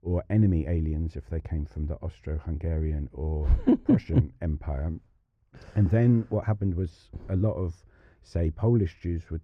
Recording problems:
muffled; very; fading above 3.5 kHz

